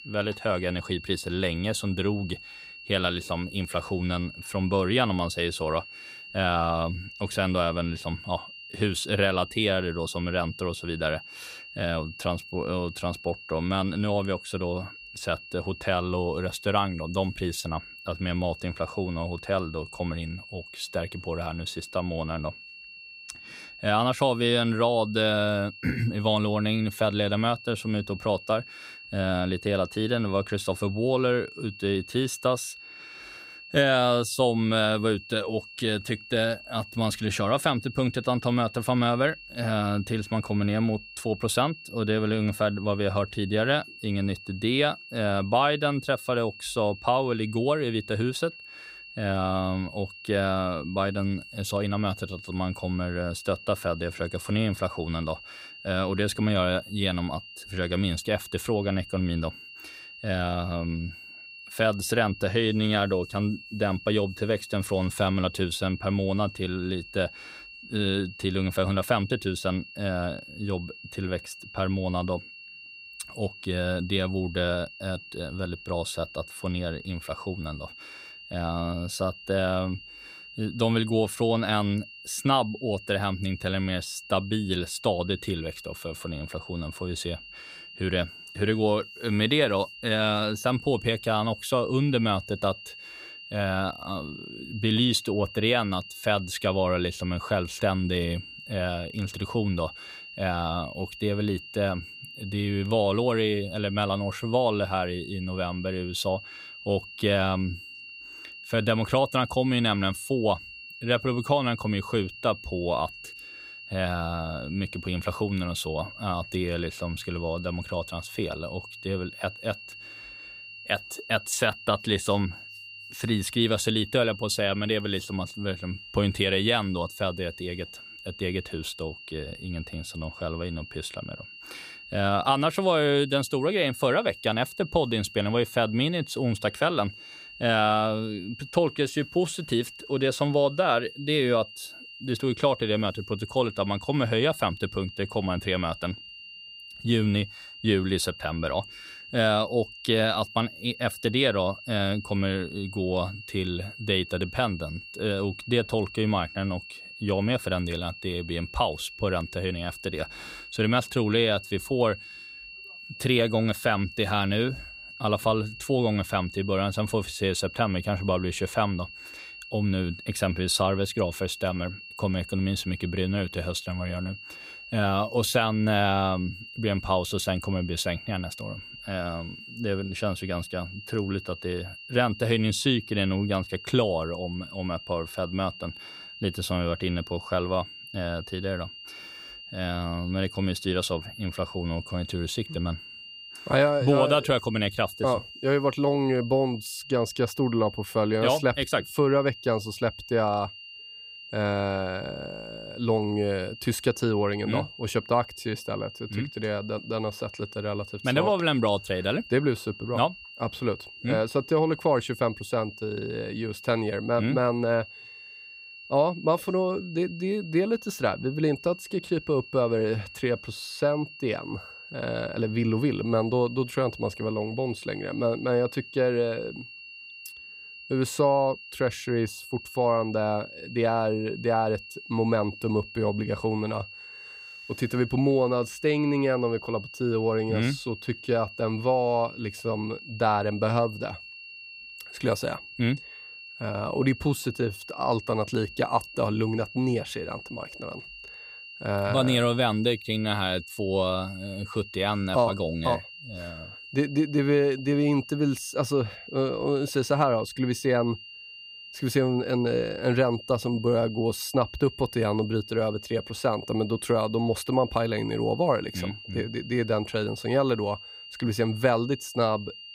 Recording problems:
high-pitched whine; noticeable; throughout; 2.5 kHz, 15 dB below the speech

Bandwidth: 15.5 kHz